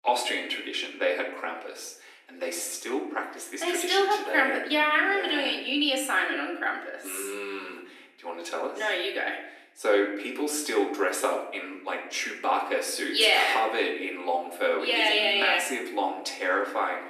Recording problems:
off-mic speech; far
thin; somewhat; fading below 250 Hz
room echo; slight; dies away in 0.7 s

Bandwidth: 14 kHz